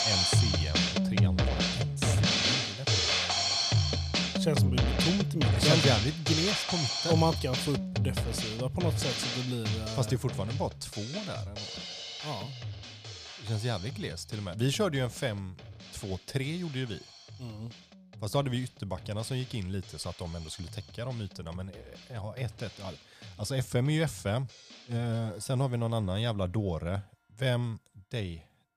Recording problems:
background music; very loud; throughout; 4 dB above the speech

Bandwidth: 15 kHz